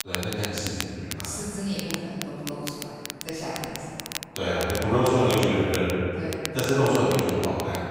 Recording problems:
room echo; strong; dies away in 2.5 s
off-mic speech; far
crackle, like an old record; loud; 10 dB below the speech

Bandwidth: 15.5 kHz